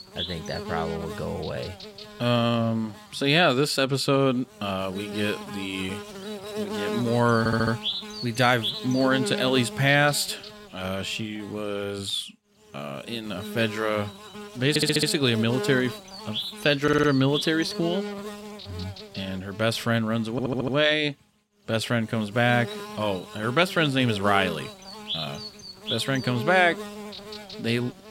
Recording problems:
electrical hum; loud; throughout; 60 Hz, 10 dB below the speech
audio stuttering; 4 times, first at 7.5 s

